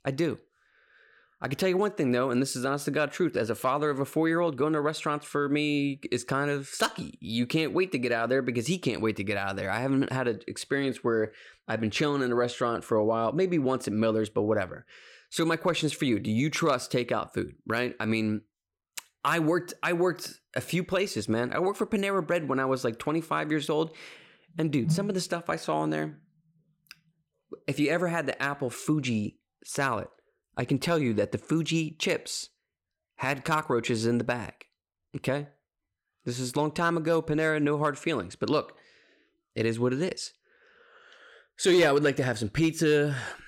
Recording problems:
none

